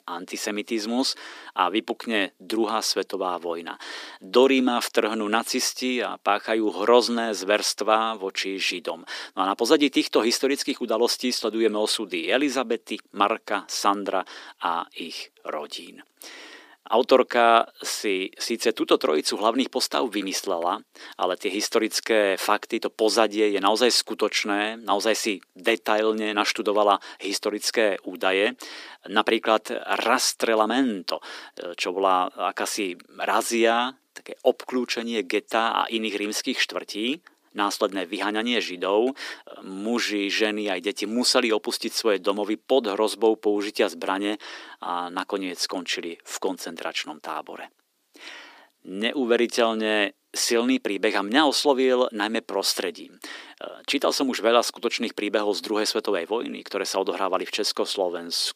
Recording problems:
thin; somewhat; fading below 300 Hz

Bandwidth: 15 kHz